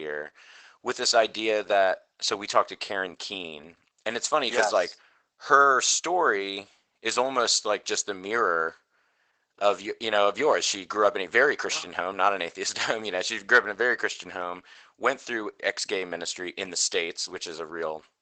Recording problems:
garbled, watery; badly; nothing above 8 kHz
thin; very; fading below 750 Hz
abrupt cut into speech; at the start

